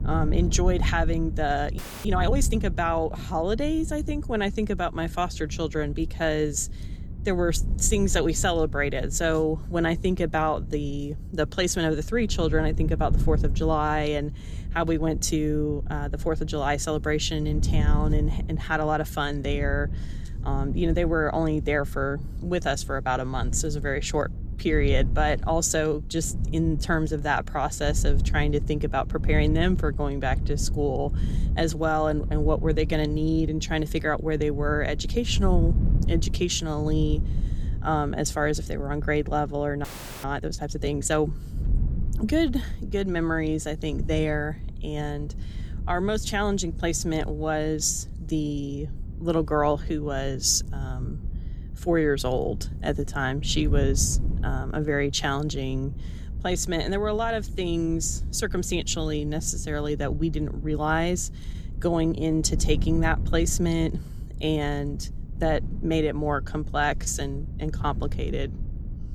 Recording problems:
wind noise on the microphone; occasional gusts; 20 dB below the speech
audio freezing; at 2 s and at 40 s

